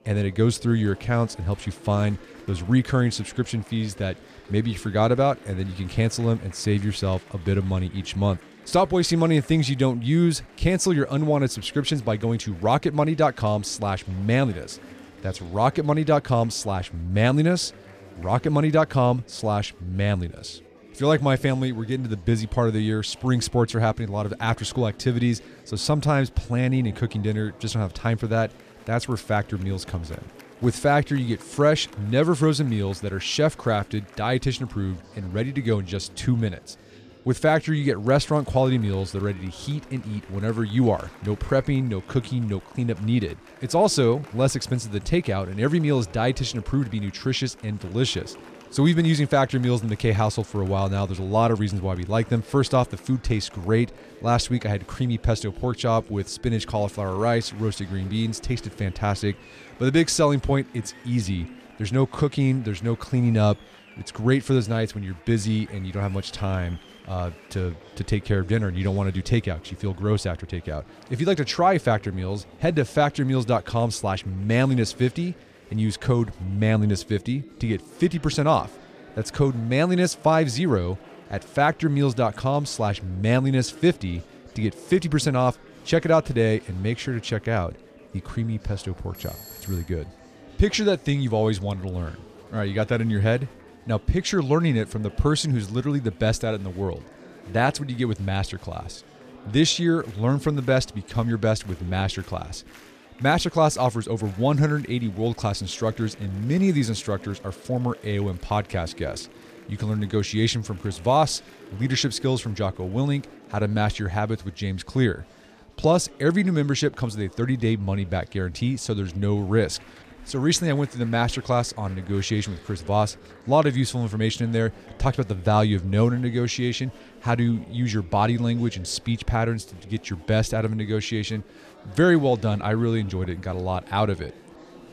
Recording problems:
chatter from many people; faint; throughout; 20 dB below the speech
doorbell; faint; at 1:29; peak 15 dB below the speech

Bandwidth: 14.5 kHz